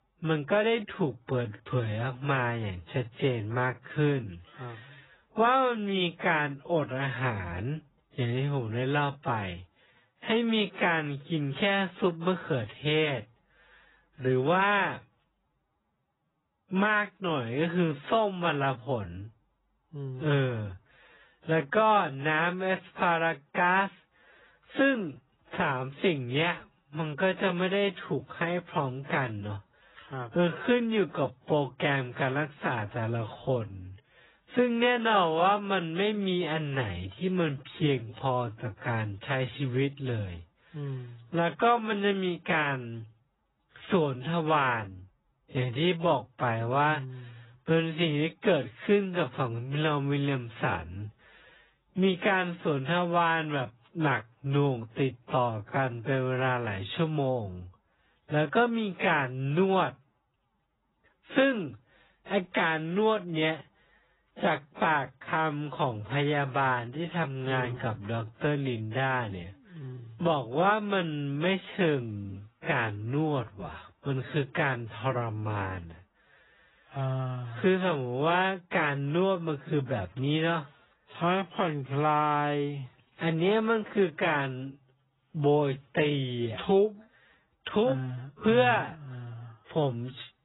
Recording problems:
garbled, watery; badly; nothing above 4 kHz
wrong speed, natural pitch; too slow; 0.5 times normal speed

